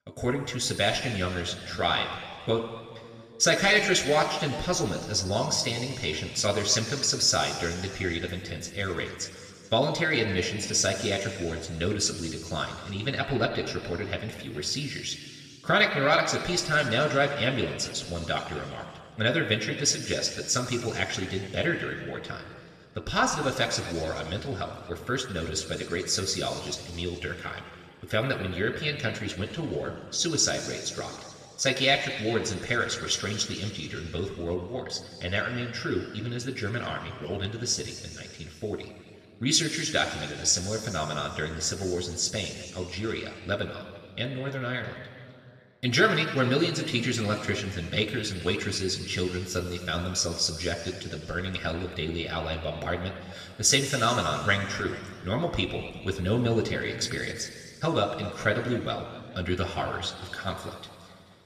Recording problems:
room echo; noticeable; dies away in 2.3 s
off-mic speech; somewhat distant

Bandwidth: 14 kHz